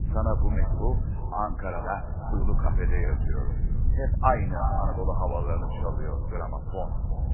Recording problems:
echo of what is said; strong; throughout; 340 ms later, 10 dB below the speech
garbled, watery; badly; nothing above 2.5 kHz
wind noise on the microphone; occasional gusts; 15 dB below the speech
uneven, jittery; strongly; from 0.5 to 7 s

